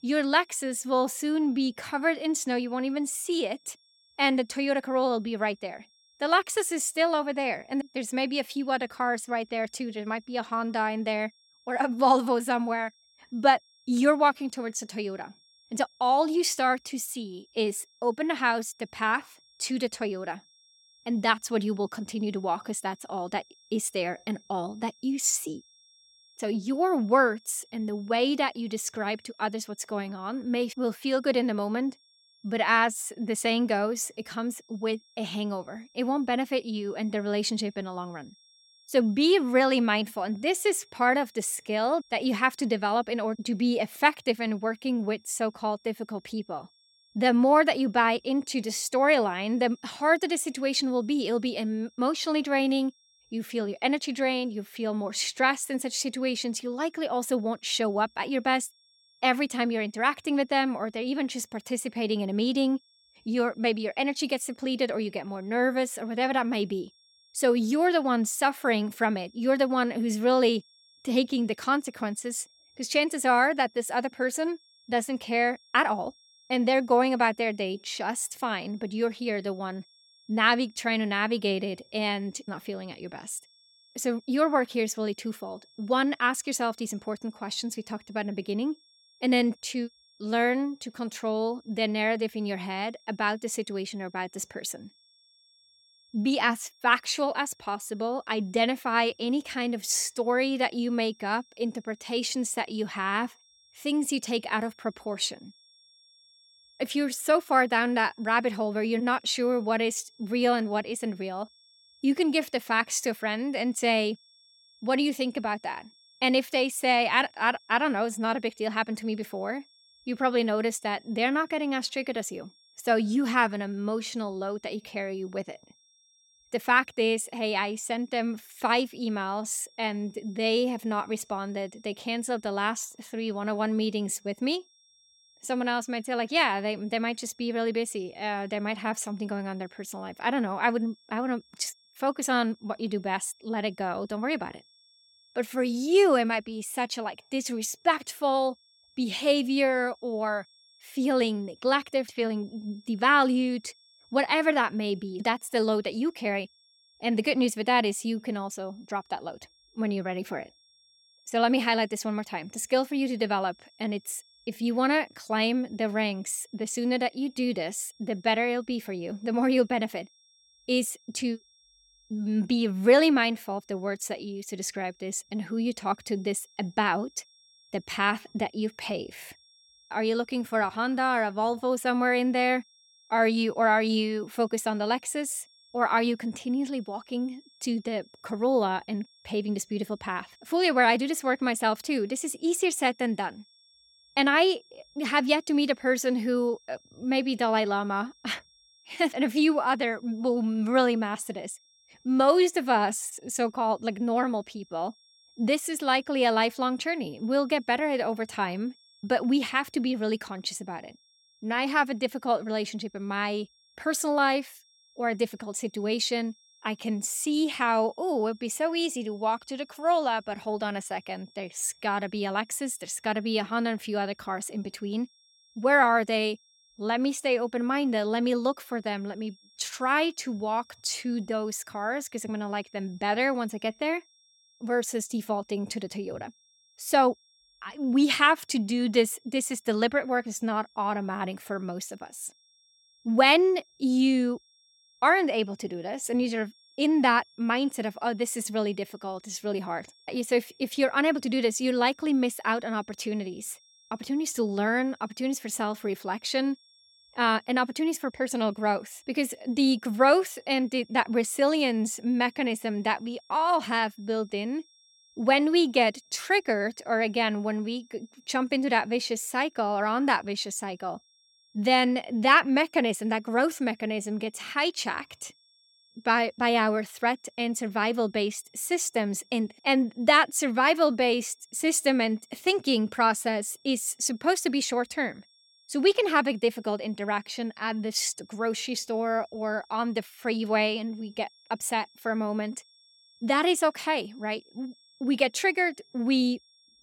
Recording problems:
high-pitched whine; faint; throughout; 5.5 kHz, 30 dB below the speech

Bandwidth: 17 kHz